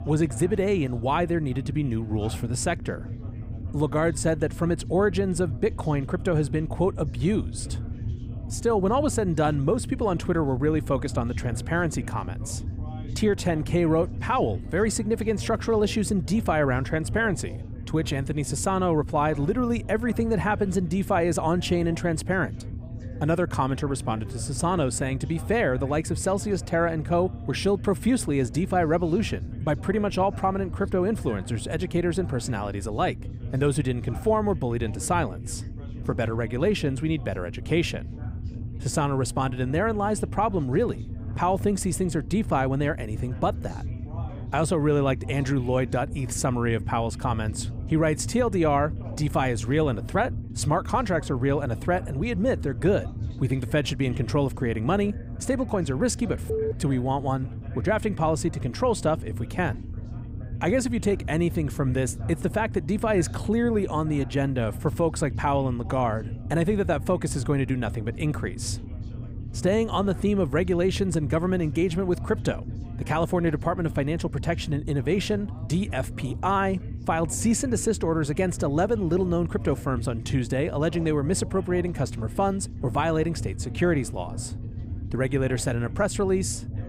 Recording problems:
low rumble; noticeable; throughout; 20 dB below the speech
chatter from many people; faint; throughout; 25 dB below the speech

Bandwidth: 15.5 kHz